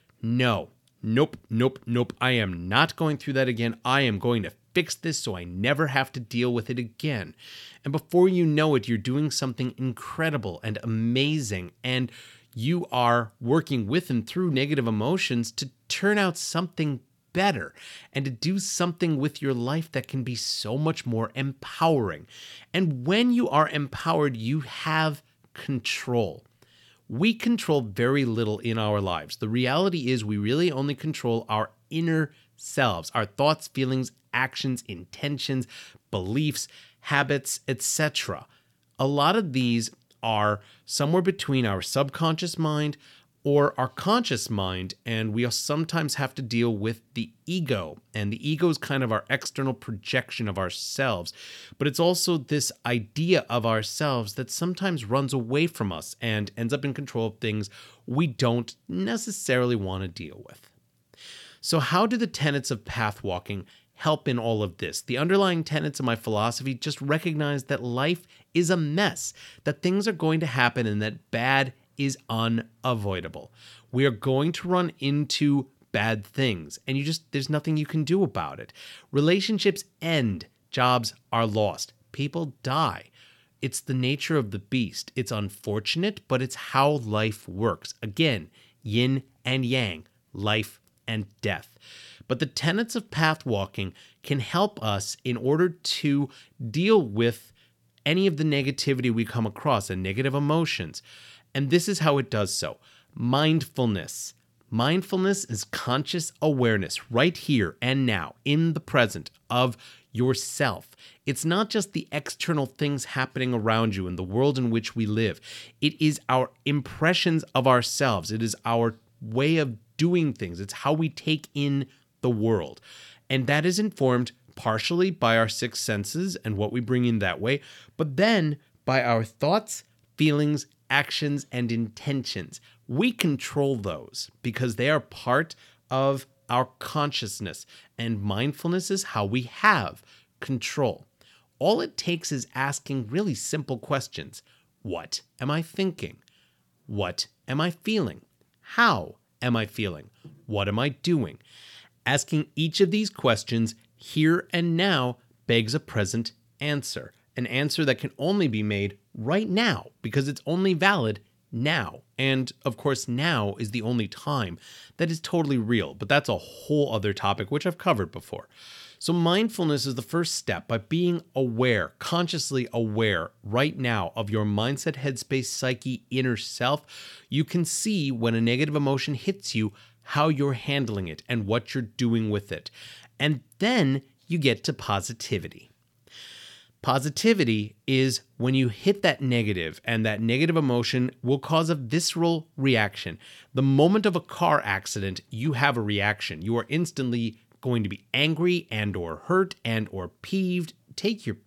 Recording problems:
none

